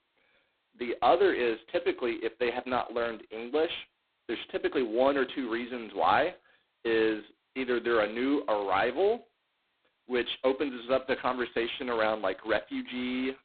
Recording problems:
phone-call audio; poor line; nothing above 4 kHz

